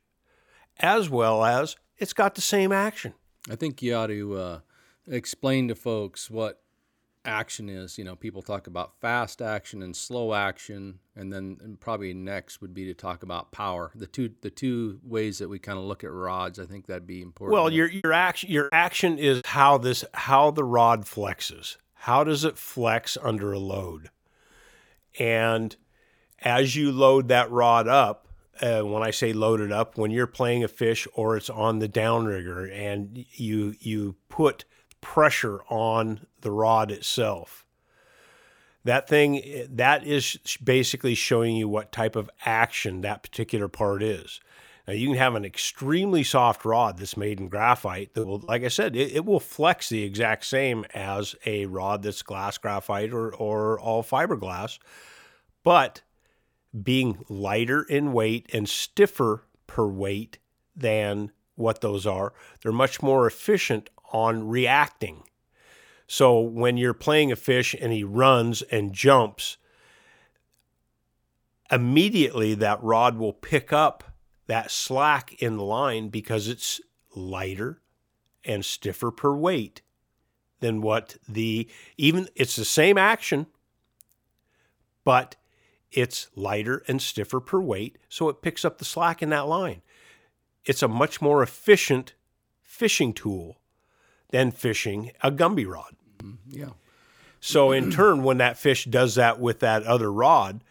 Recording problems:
choppy; very; from 18 to 19 s and at 48 s; 9% of the speech affected

